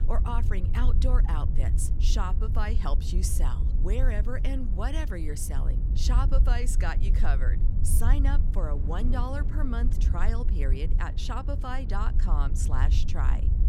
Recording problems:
low rumble; loud; throughout; 10 dB below the speech
wind noise on the microphone; occasional gusts; 15 dB below the speech

